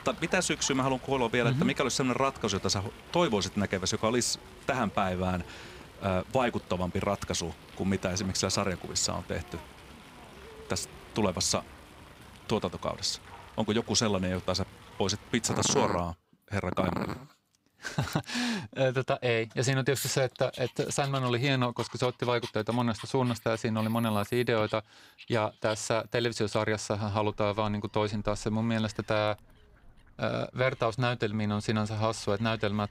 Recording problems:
animal sounds; noticeable; throughout; 15 dB below the speech

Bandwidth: 15.5 kHz